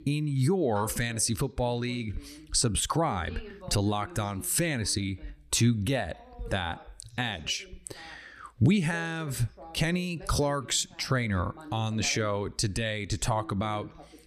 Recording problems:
voice in the background; faint; throughout; 20 dB below the speech

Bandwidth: 14.5 kHz